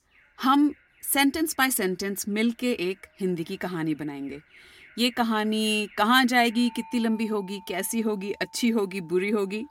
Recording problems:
alarms or sirens; faint; throughout; 25 dB below the speech

